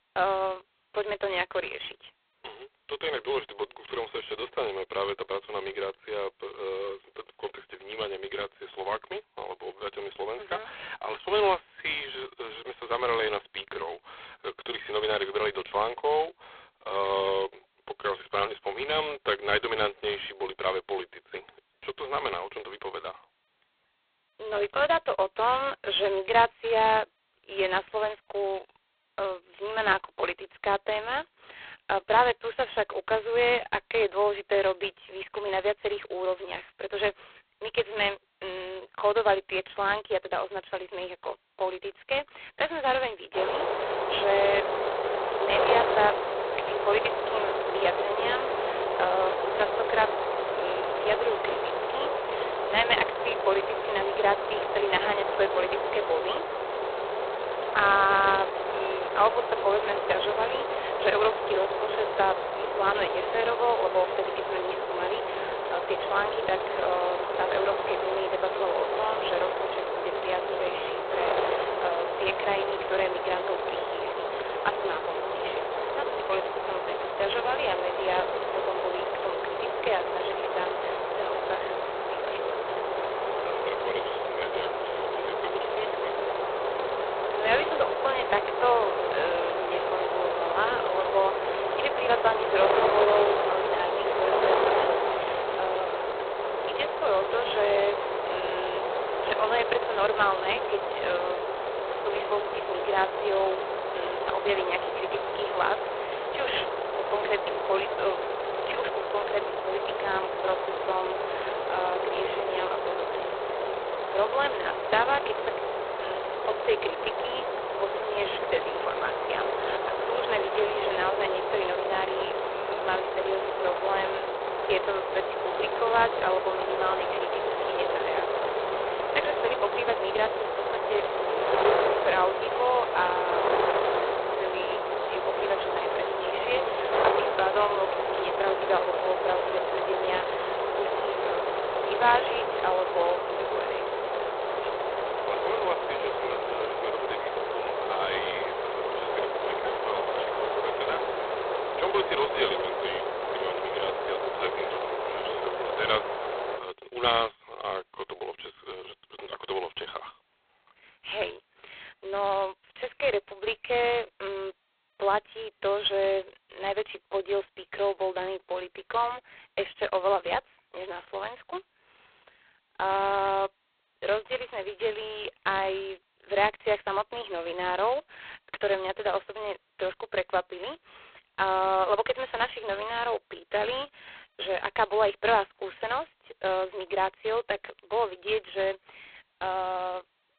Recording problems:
phone-call audio; poor line; nothing above 4 kHz
wind noise on the microphone; heavy; from 43 s to 2:37; as loud as the speech

